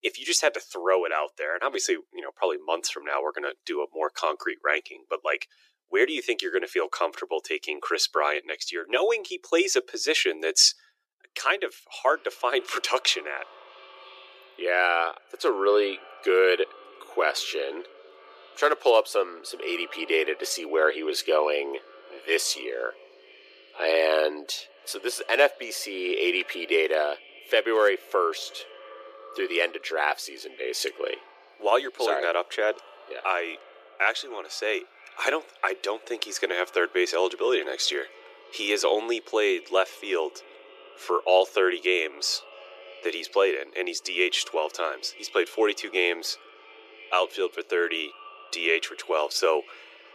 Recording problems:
thin; very; fading below 350 Hz
echo of what is said; faint; from 12 s on; 290 ms later, 25 dB below the speech

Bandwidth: 14.5 kHz